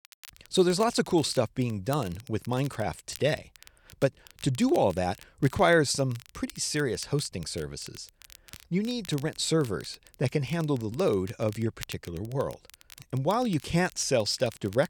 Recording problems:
crackle, like an old record; faint; 20 dB below the speech

